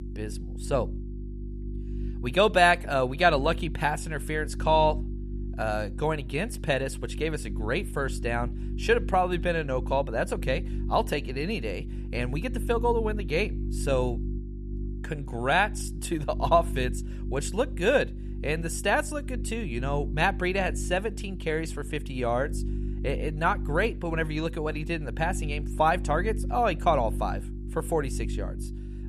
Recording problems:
electrical hum; noticeable; throughout; 50 Hz, 20 dB below the speech

